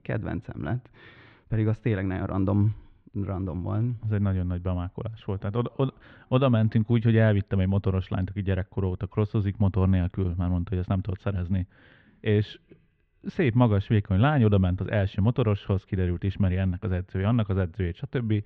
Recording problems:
muffled; very; fading above 2.5 kHz

